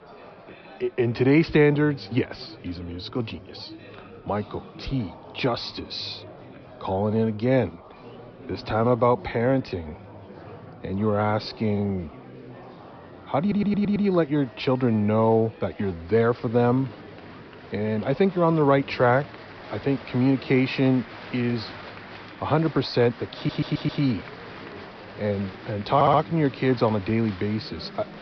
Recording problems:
high frequencies cut off; noticeable; nothing above 5.5 kHz
murmuring crowd; noticeable; throughout; 20 dB below the speech
audio stuttering; at 13 s, at 23 s and at 26 s

